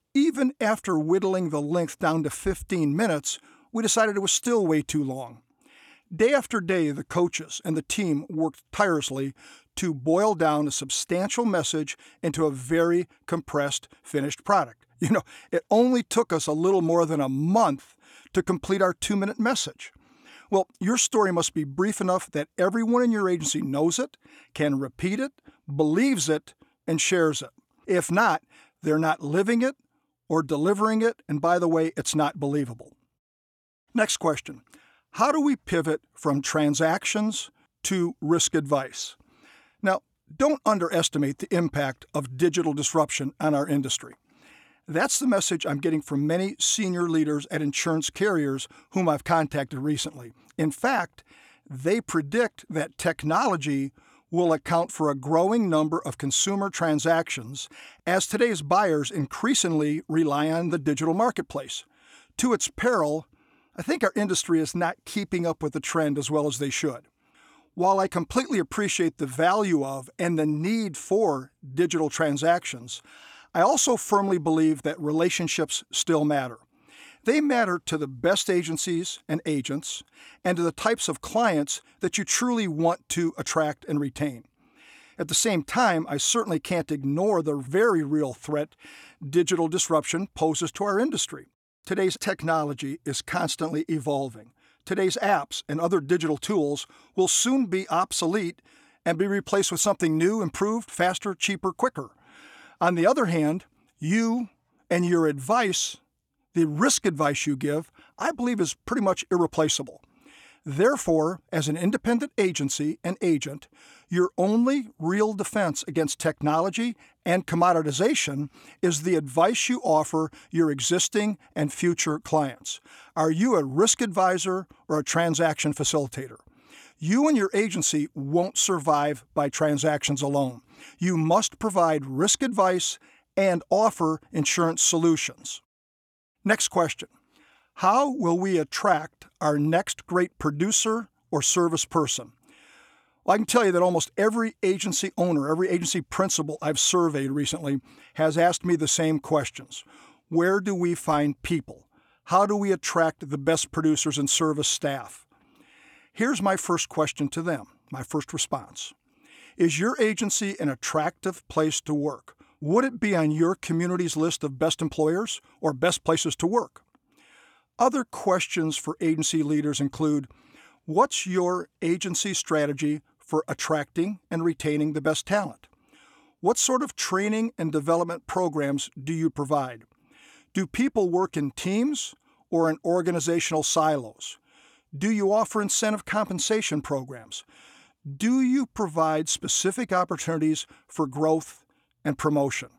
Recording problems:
none

